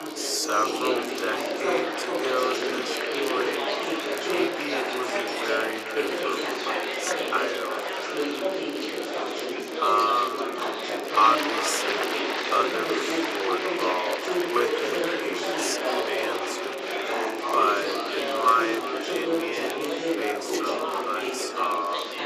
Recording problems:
thin; very; fading below 350 Hz
wrong speed, natural pitch; too slow; 0.5 times normal speed
echo of what is said; noticeable; throughout; 370 ms later, 15 dB below the speech
chatter from many people; very loud; throughout; 1 dB above the speech
crackle, like an old record; noticeable; 20 dB below the speech

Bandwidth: 14.5 kHz